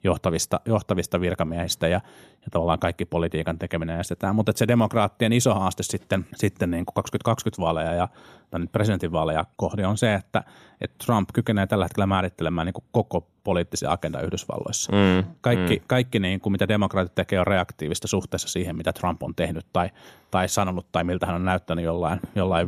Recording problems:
abrupt cut into speech; at the end

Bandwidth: 14.5 kHz